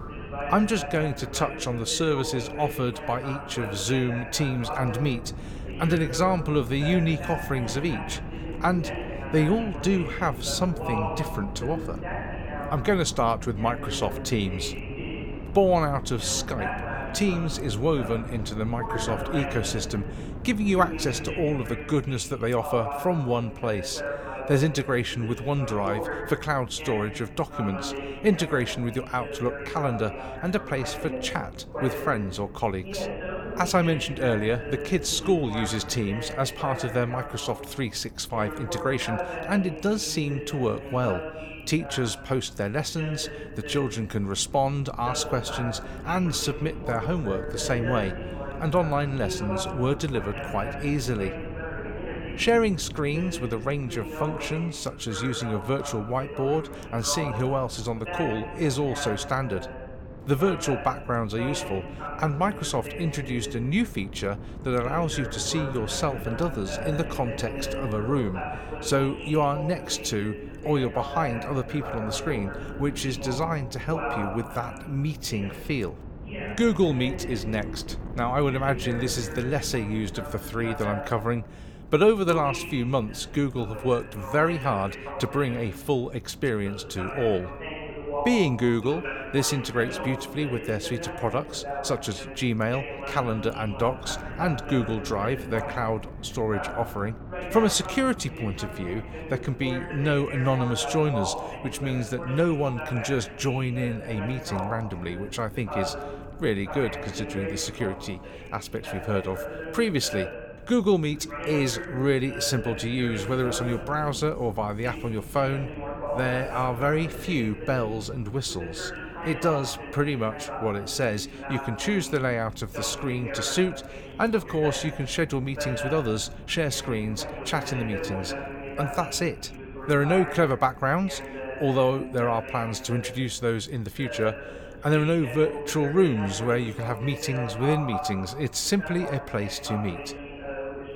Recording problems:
voice in the background; loud; throughout; 9 dB below the speech
wind noise on the microphone; occasional gusts; 20 dB below the speech

